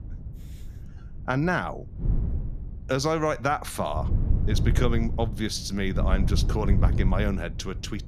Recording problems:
wind noise on the microphone; occasional gusts; 15 dB below the speech

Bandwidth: 14.5 kHz